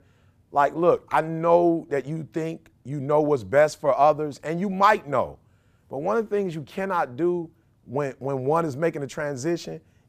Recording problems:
none

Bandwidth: 15 kHz